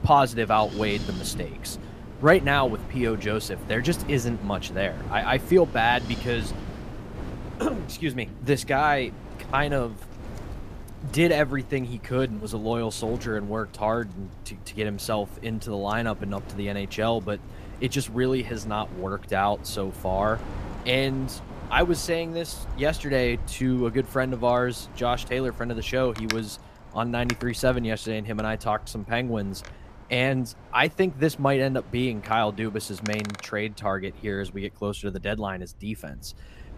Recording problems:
wind in the background; noticeable; throughout; 15 dB below the speech

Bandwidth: 14.5 kHz